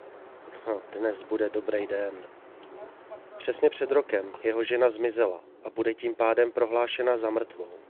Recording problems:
phone-call audio
wind in the background; faint; throughout; 20 dB below the speech

